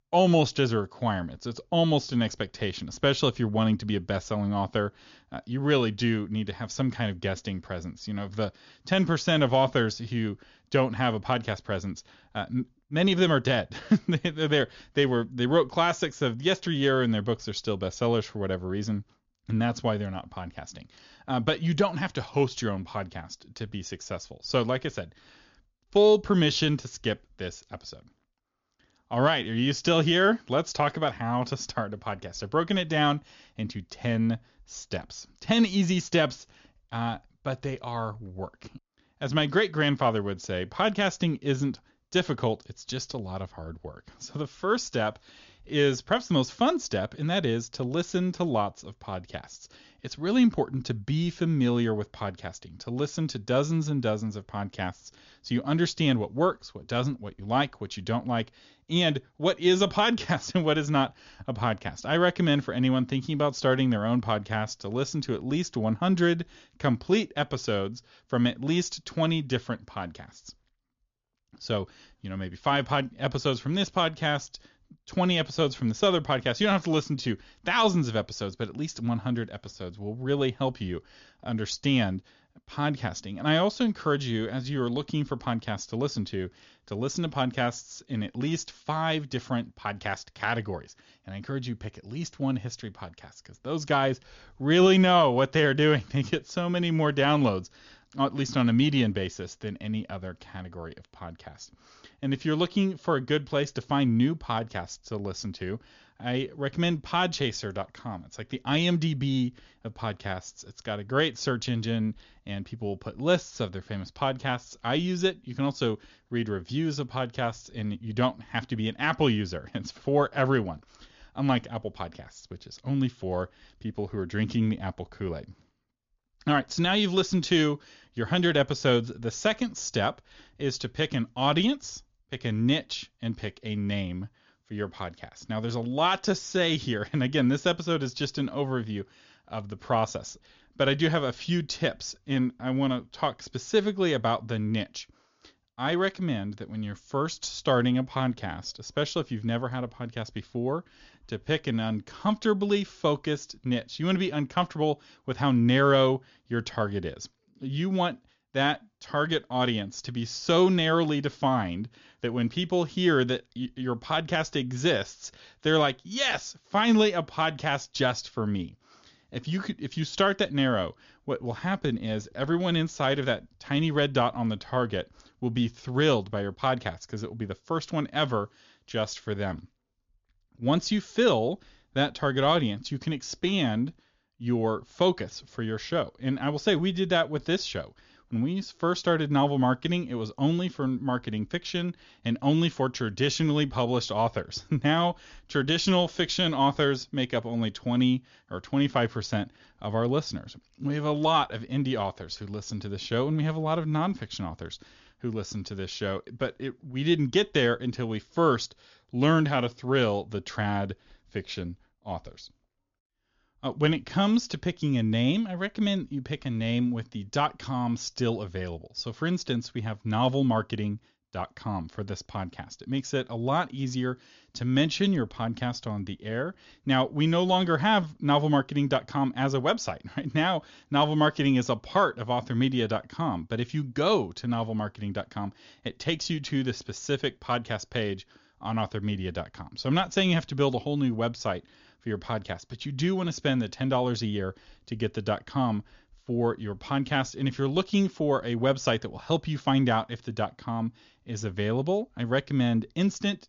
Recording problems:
high frequencies cut off; noticeable; nothing above 7 kHz

